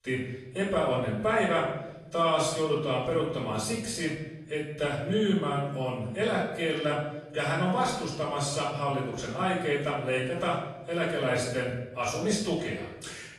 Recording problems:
off-mic speech; far
room echo; noticeable; dies away in 0.8 s
garbled, watery; slightly

